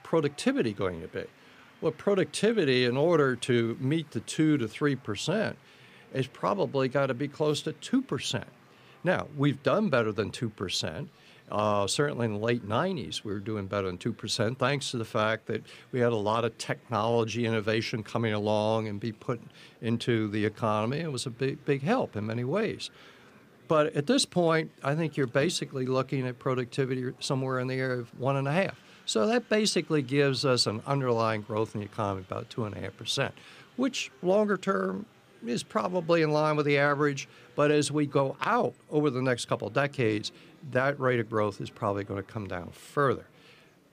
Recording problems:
murmuring crowd; faint; throughout; 30 dB below the speech

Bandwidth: 15 kHz